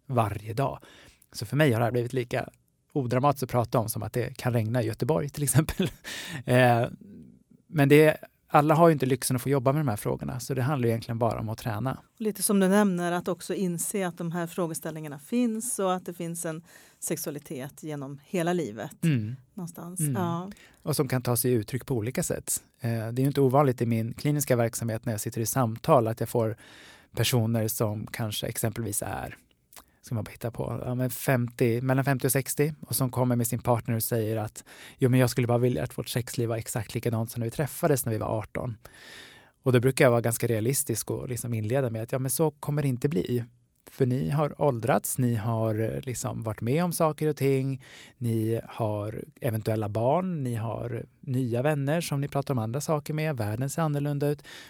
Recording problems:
none

